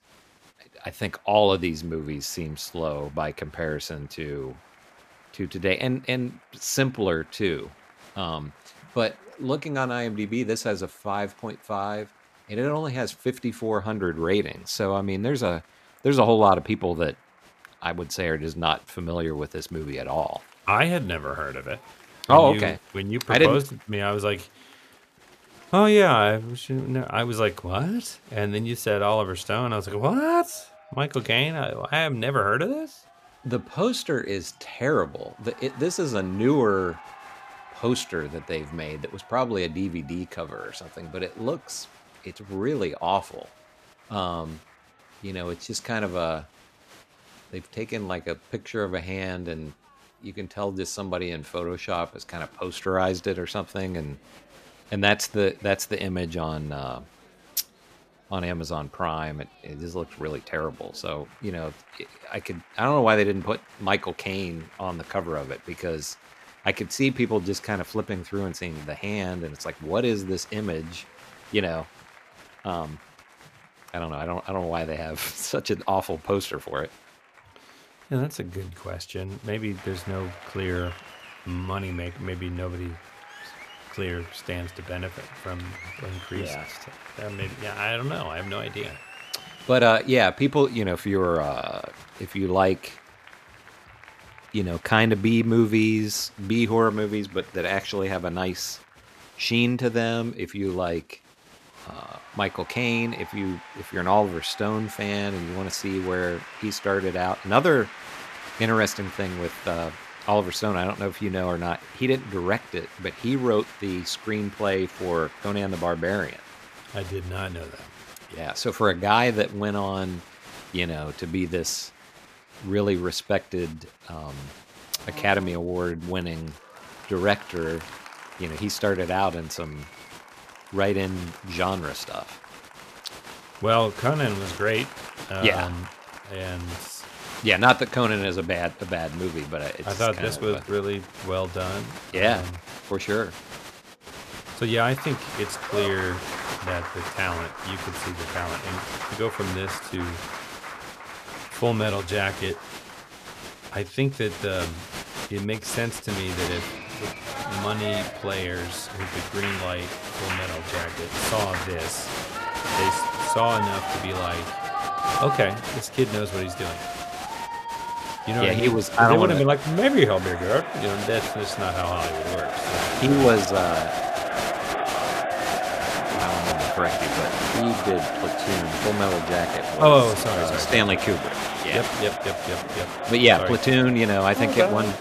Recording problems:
crowd noise; loud; throughout; 7 dB below the speech

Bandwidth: 14.5 kHz